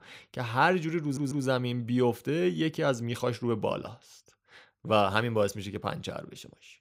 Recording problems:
audio stuttering; at 1 s

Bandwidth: 15.5 kHz